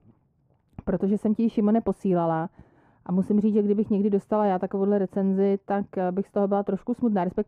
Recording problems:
muffled; very; fading above 2 kHz

